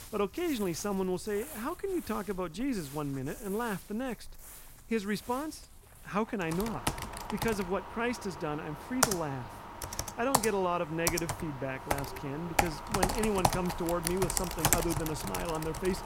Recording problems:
household noises; loud; throughout; as loud as the speech

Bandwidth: 16 kHz